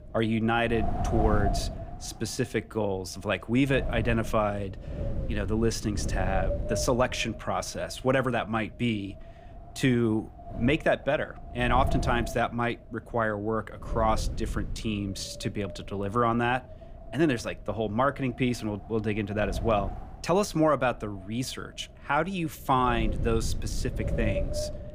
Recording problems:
wind noise on the microphone; occasional gusts; 10 dB below the speech

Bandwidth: 15.5 kHz